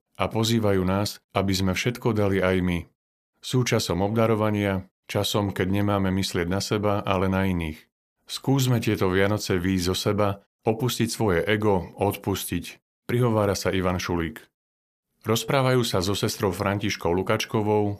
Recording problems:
none

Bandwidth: 14.5 kHz